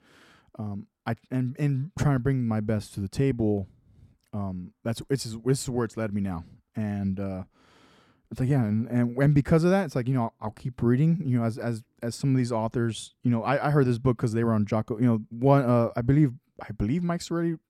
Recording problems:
none

